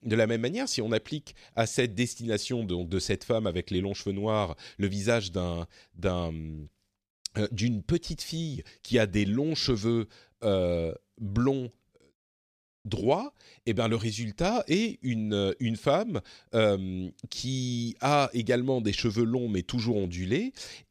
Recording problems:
none

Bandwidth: 14.5 kHz